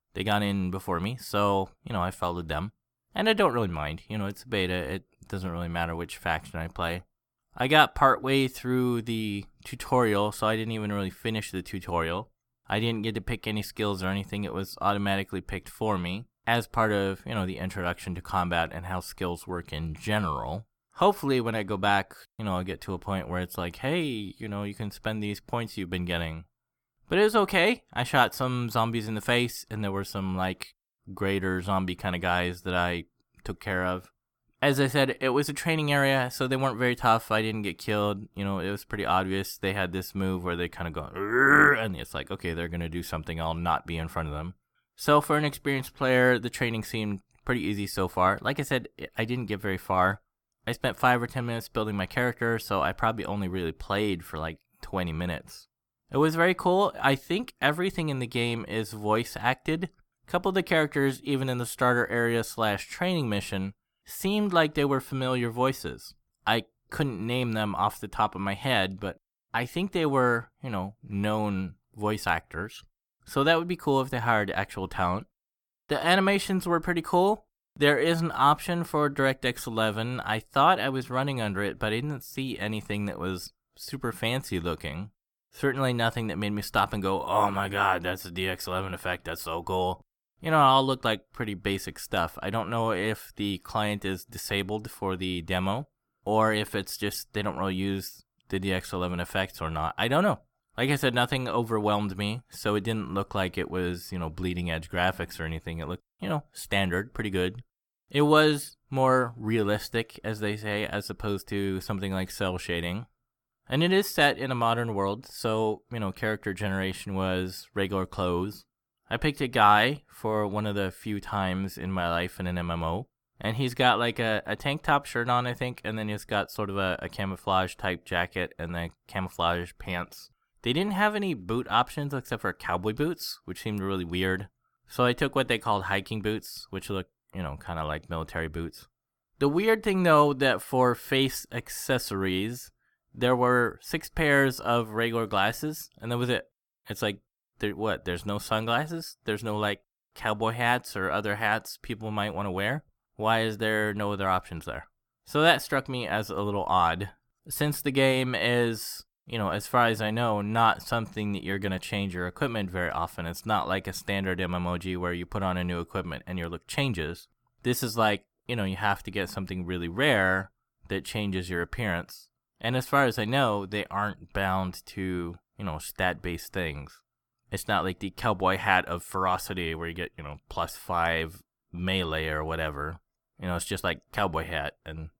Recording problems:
none

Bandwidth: 18.5 kHz